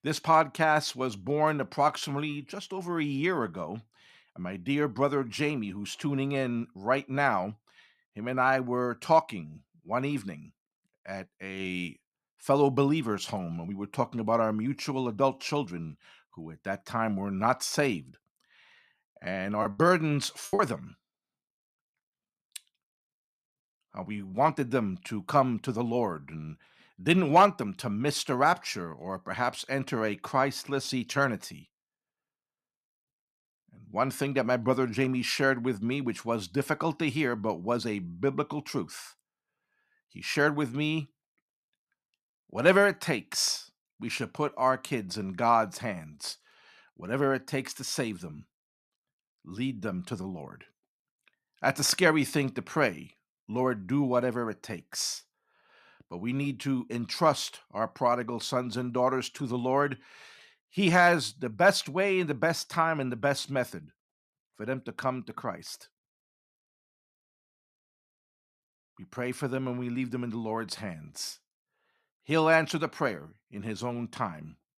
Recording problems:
choppy; very; at 20 s; 16% of the speech affected

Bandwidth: 14 kHz